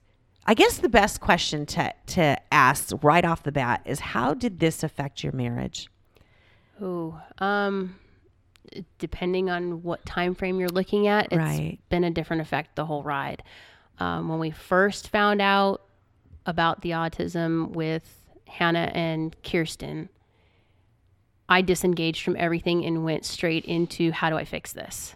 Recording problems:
none

